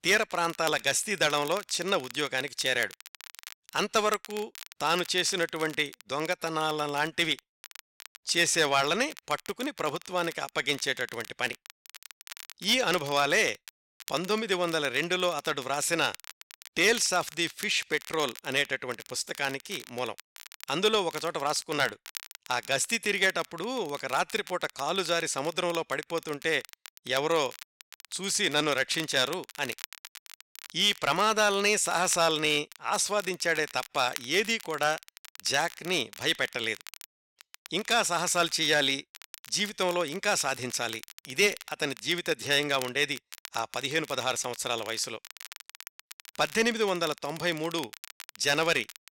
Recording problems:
crackle, like an old record; noticeable; 15 dB below the speech

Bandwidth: 16 kHz